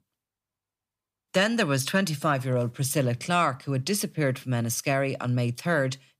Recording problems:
none

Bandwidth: 15 kHz